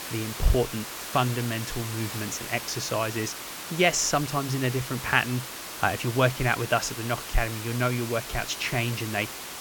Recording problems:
hiss; loud; throughout; 8 dB below the speech

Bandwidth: 17.5 kHz